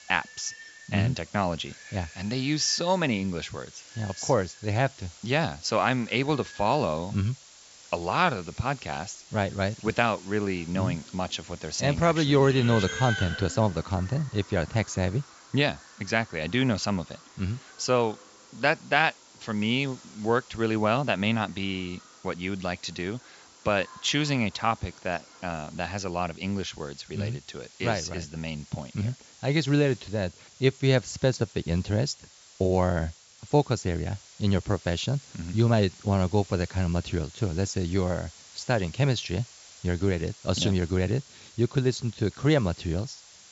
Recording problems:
high frequencies cut off; noticeable; nothing above 8 kHz
animal sounds; noticeable; until 26 s; 15 dB below the speech
hiss; faint; throughout; 20 dB below the speech

